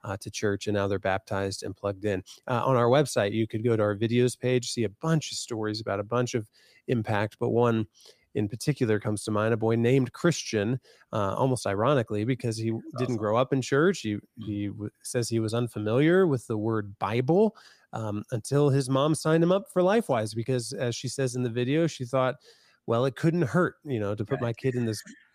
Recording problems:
none

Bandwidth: 15 kHz